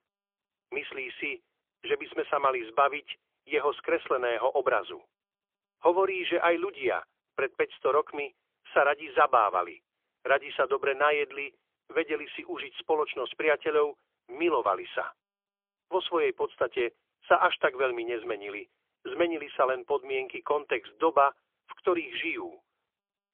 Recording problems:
phone-call audio; poor line; nothing above 3.5 kHz

